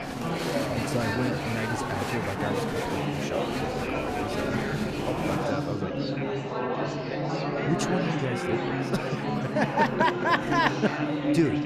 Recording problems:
murmuring crowd; very loud; throughout; 1 dB above the speech
traffic noise; noticeable; until 5.5 s; 15 dB below the speech

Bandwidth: 14.5 kHz